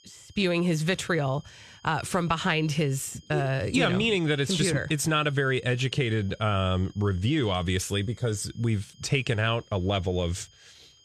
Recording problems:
high-pitched whine; faint; throughout; 3 kHz, 30 dB below the speech

